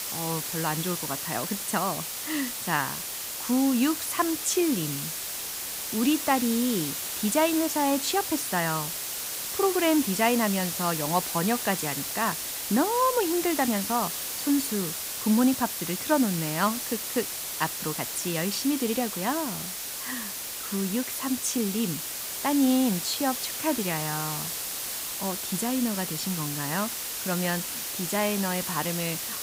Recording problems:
hiss; loud; throughout; 3 dB below the speech

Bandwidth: 15.5 kHz